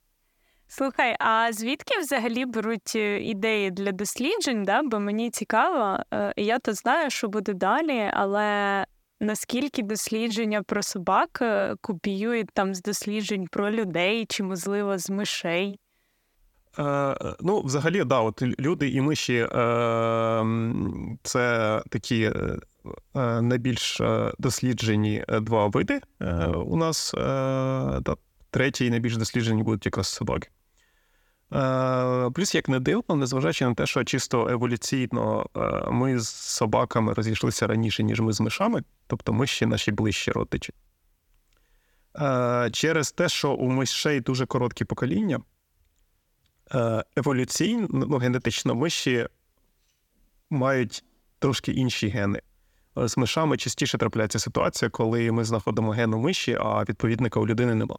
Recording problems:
none

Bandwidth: 17.5 kHz